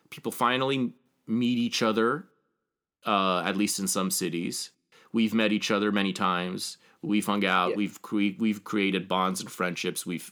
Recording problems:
none

